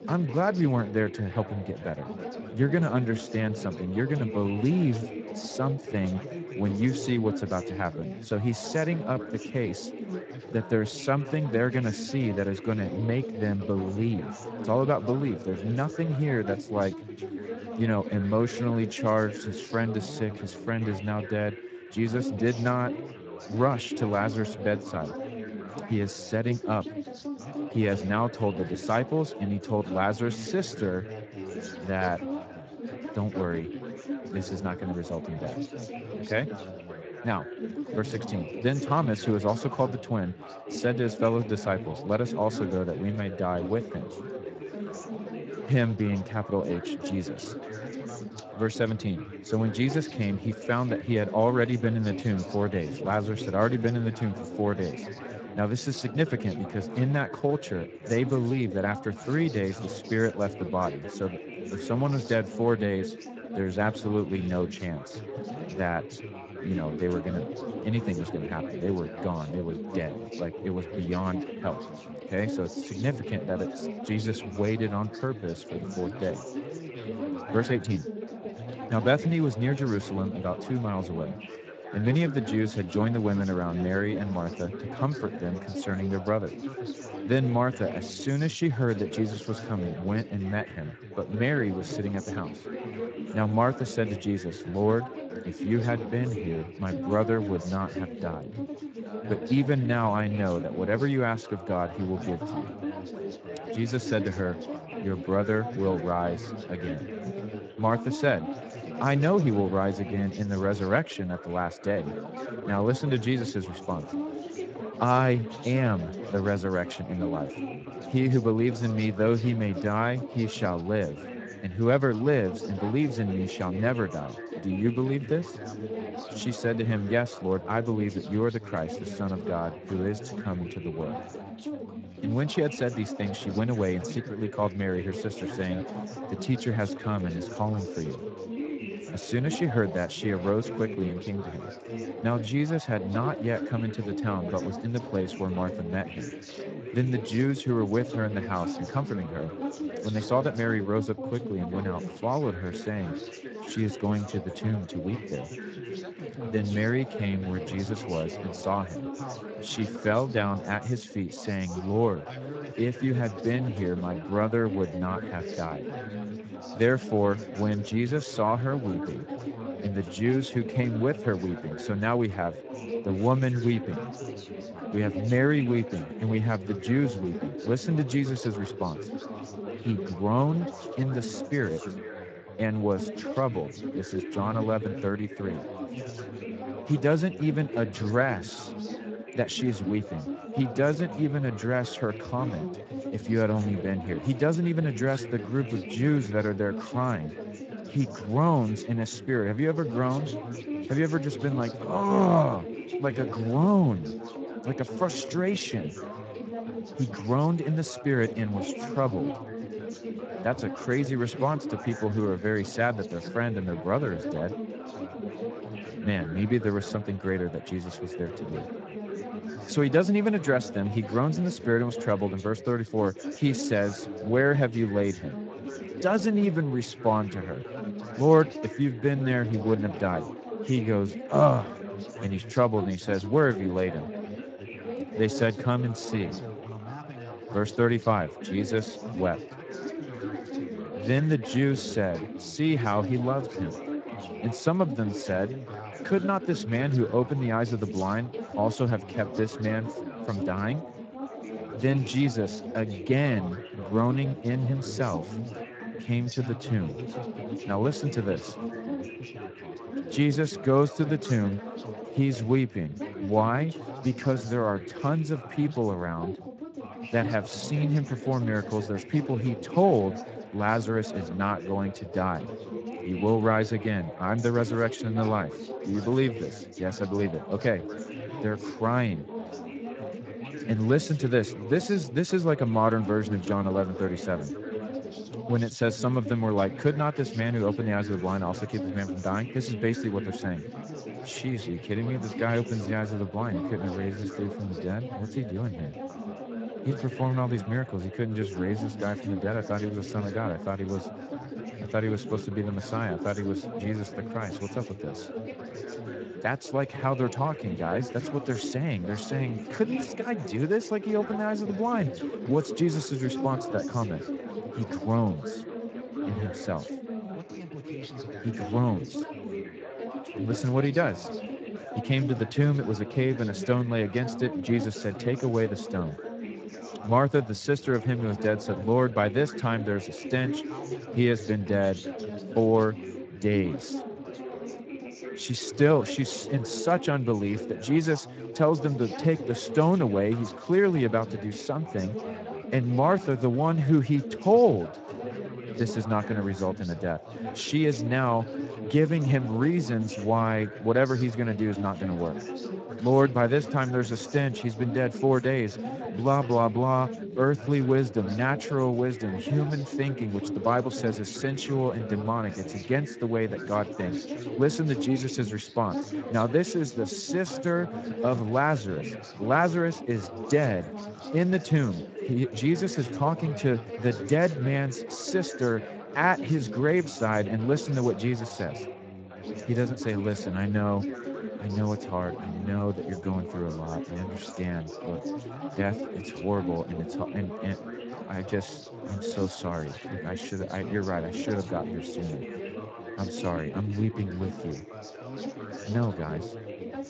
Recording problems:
garbled, watery; slightly; nothing above 7.5 kHz
background chatter; loud; throughout; 4 voices, 9 dB below the speech

